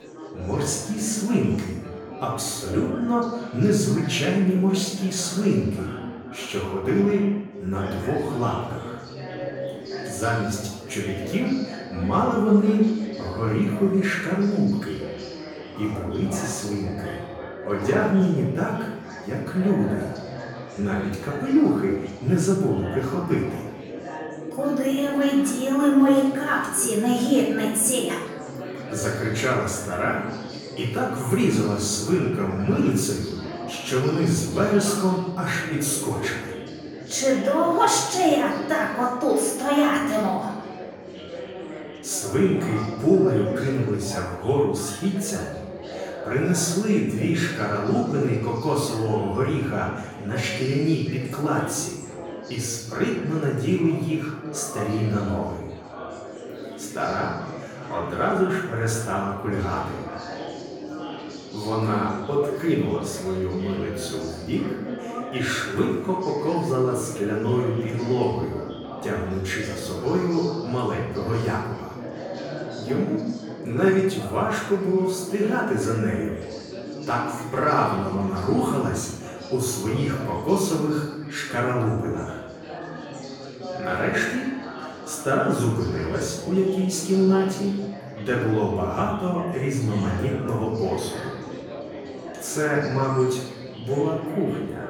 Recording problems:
off-mic speech; far
room echo; noticeable; dies away in 0.8 s
chatter from many people; noticeable; throughout; 10 dB below the speech

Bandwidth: 18 kHz